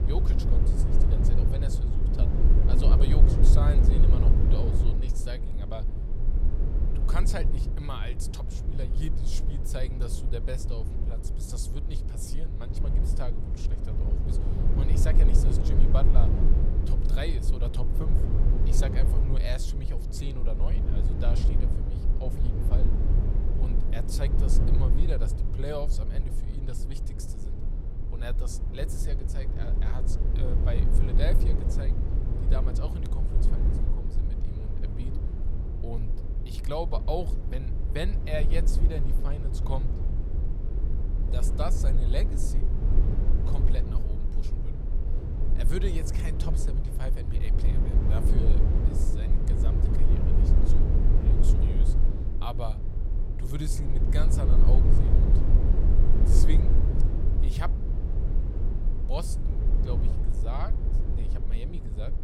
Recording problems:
low rumble; loud; throughout; 2 dB below the speech

